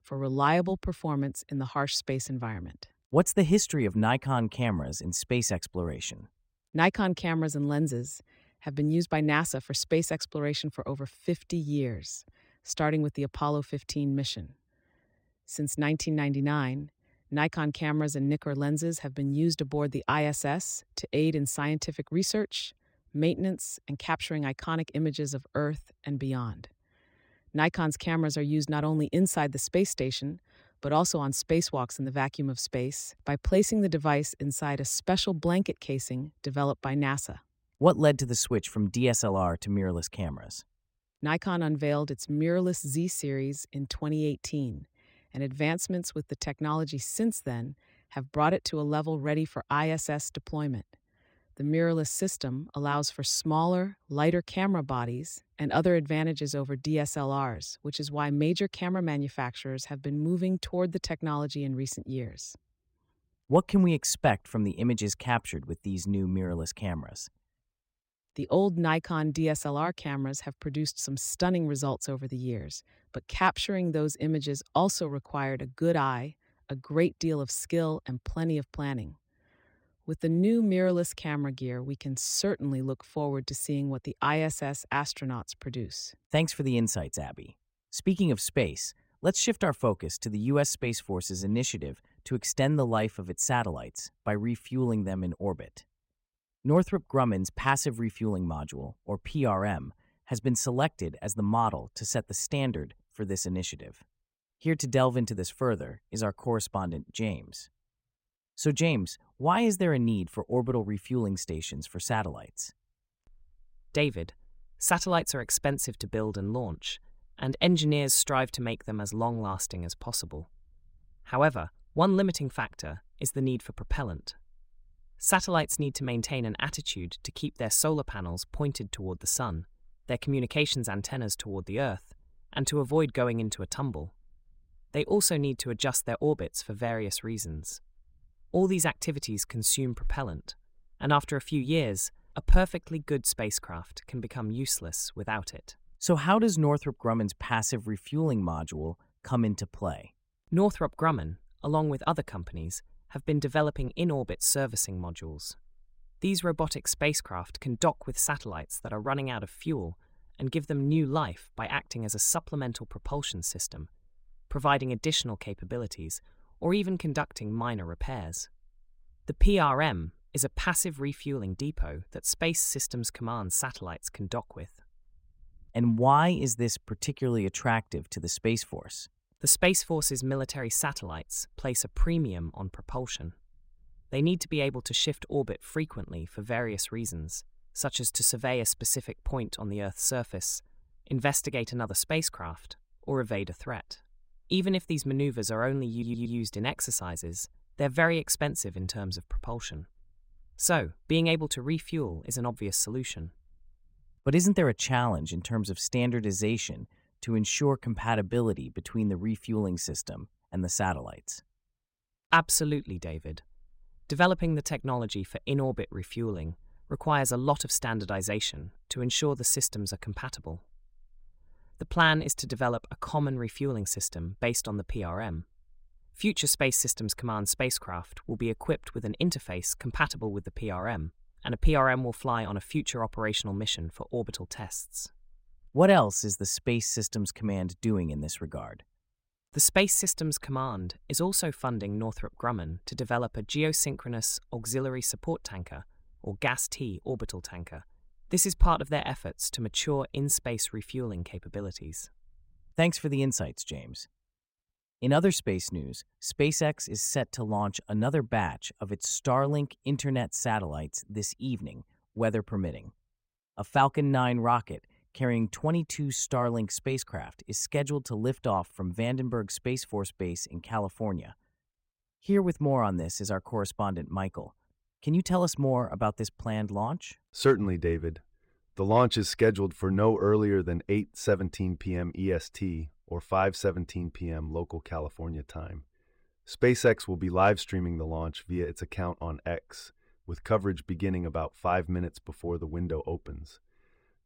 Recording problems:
audio stuttering; at 3:16

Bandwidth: 16 kHz